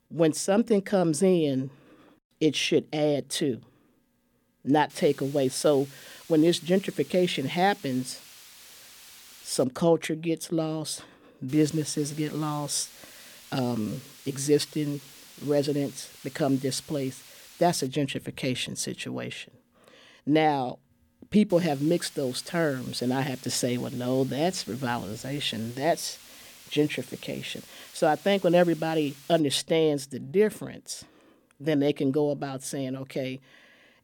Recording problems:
hiss; noticeable; from 5 to 9.5 s, from 11 to 18 s and from 22 to 29 s; 20 dB below the speech

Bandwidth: 18.5 kHz